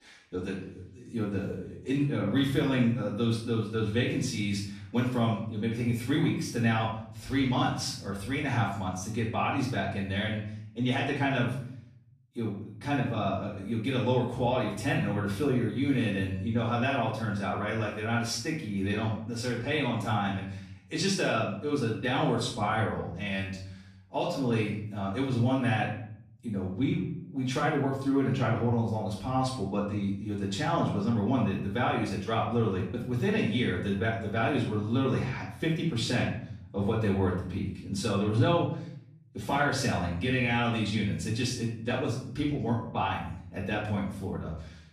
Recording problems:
off-mic speech; far
room echo; noticeable; dies away in 0.7 s

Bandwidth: 14.5 kHz